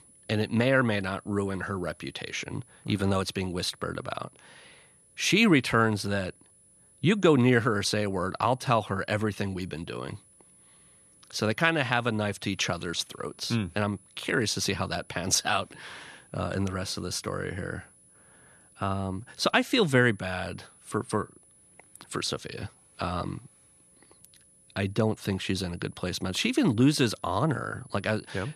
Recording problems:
high-pitched whine; faint; throughout; 10 kHz, 30 dB below the speech

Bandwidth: 13.5 kHz